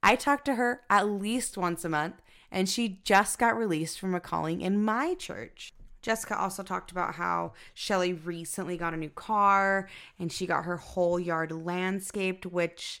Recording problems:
none

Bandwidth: 16.5 kHz